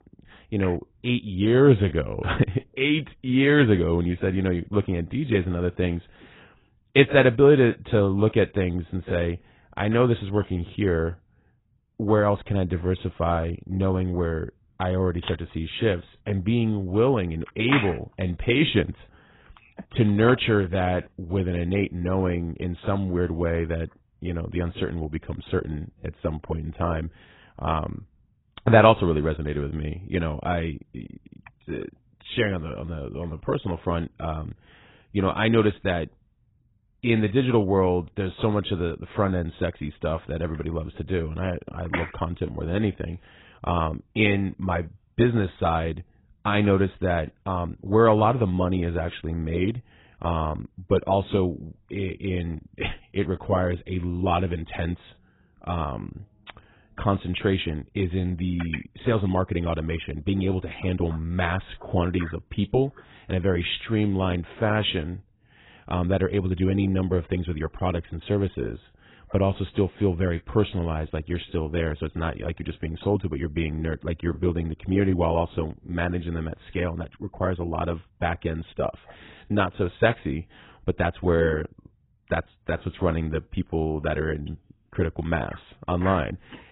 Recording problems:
garbled, watery; badly; nothing above 4 kHz

